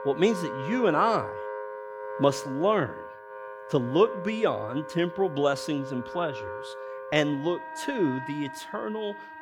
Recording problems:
background music; loud; throughout; 10 dB below the speech

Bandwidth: 18.5 kHz